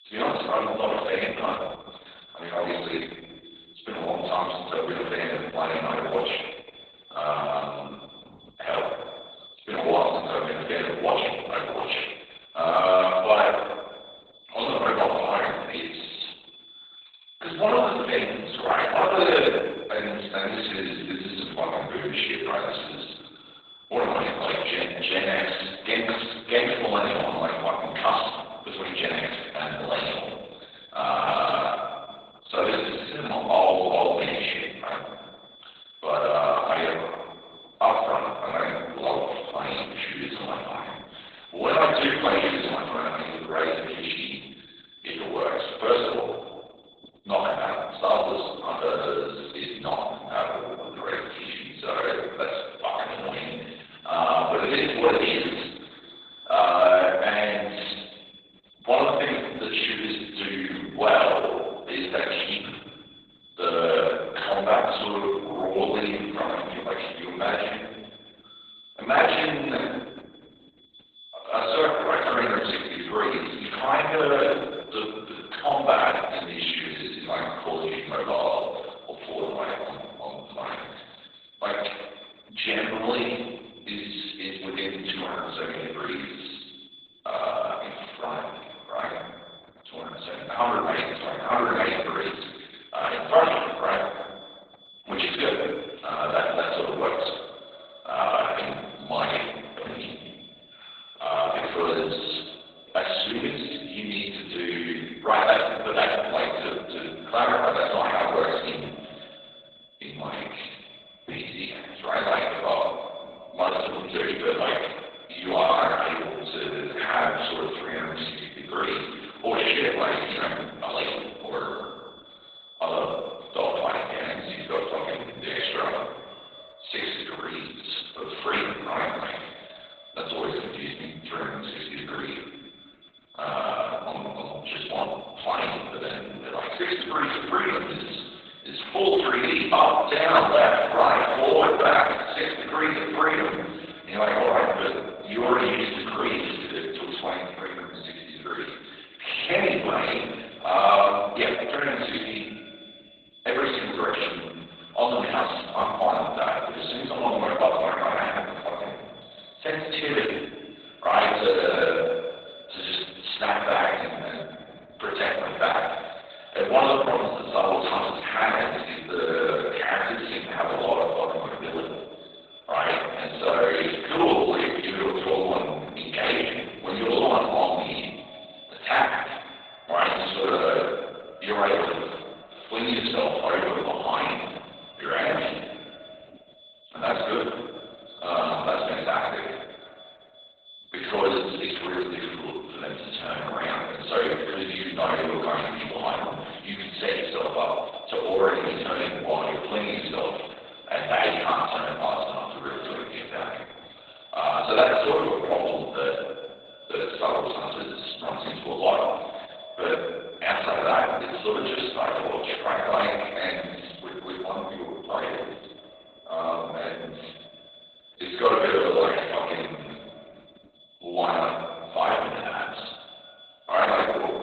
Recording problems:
off-mic speech; far
garbled, watery; badly; nothing above 4 kHz
thin; very; fading below 550 Hz
room echo; noticeable; dies away in 1.2 s
echo of what is said; faint; from 1:35 on; 320 ms later, 25 dB below the speech
high-pitched whine; noticeable; throughout; 3.5 kHz, 20 dB below the speech

